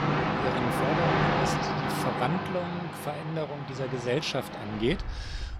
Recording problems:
train or aircraft noise; very loud; throughout; 3 dB above the speech

